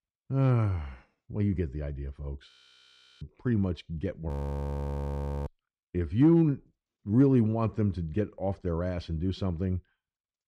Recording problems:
audio freezing; at 2.5 s for 0.5 s and at 4.5 s for 1 s

